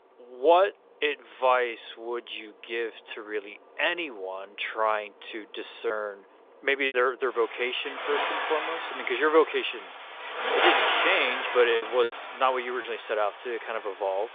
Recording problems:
phone-call audio; nothing above 3.5 kHz
traffic noise; loud; throughout; 2 dB below the speech
choppy; occasionally; 2% of the speech affected

